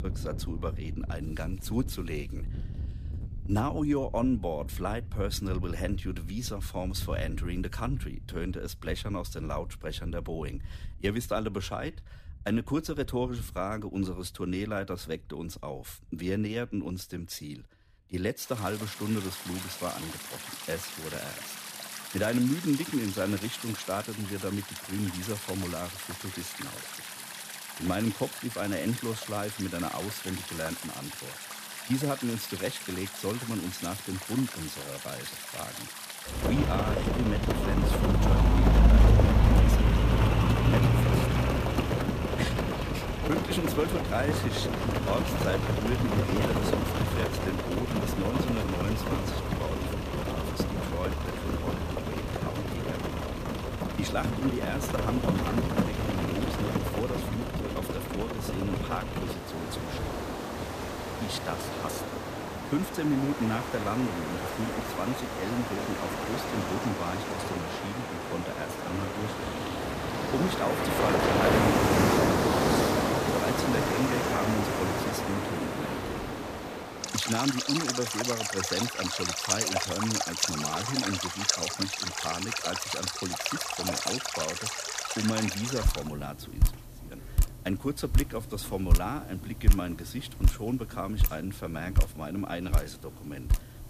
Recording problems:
rain or running water; very loud; throughout; 4 dB above the speech

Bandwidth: 14.5 kHz